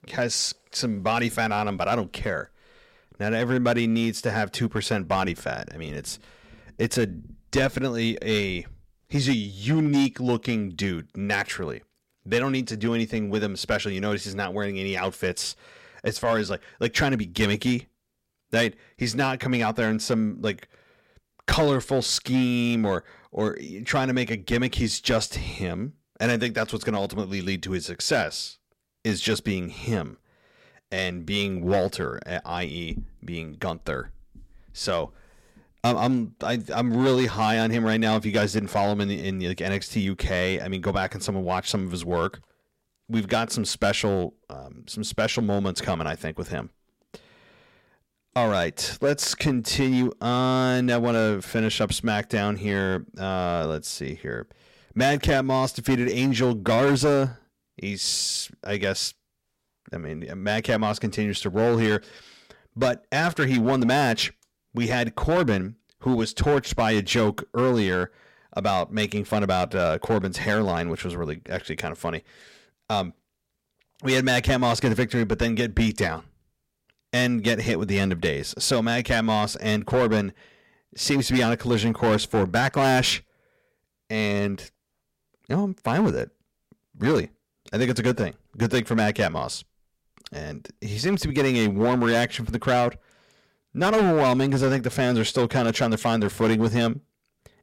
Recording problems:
distortion; slight; 5% of the sound clipped

